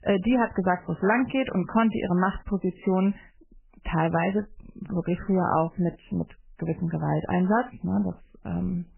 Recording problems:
garbled, watery; badly; nothing above 3 kHz

